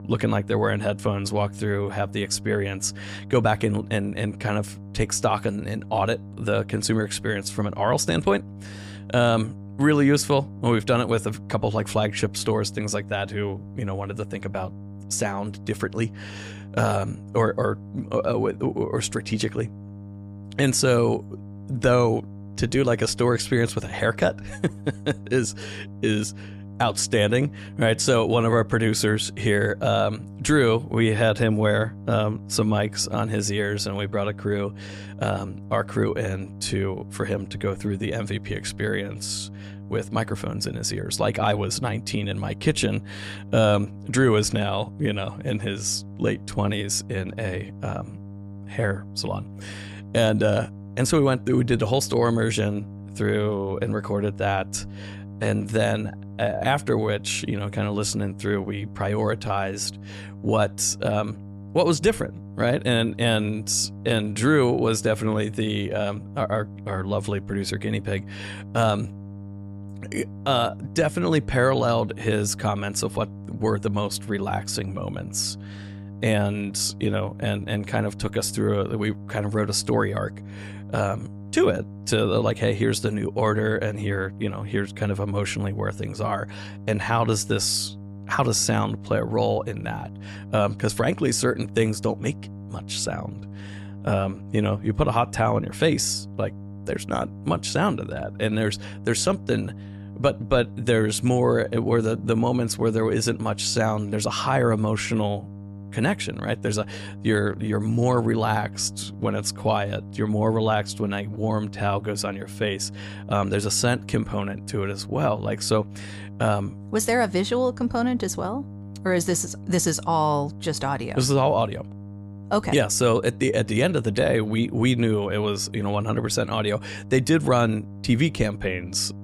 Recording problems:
electrical hum; faint; throughout; 50 Hz, 20 dB below the speech

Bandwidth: 15 kHz